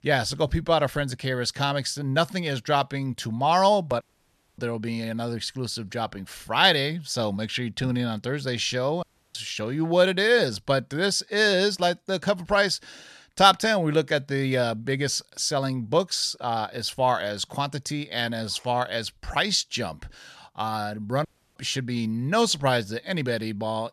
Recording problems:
audio cutting out; at 4 s for 0.5 s, at 9 s and at 21 s

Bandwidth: 13.5 kHz